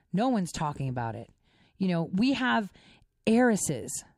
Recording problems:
none

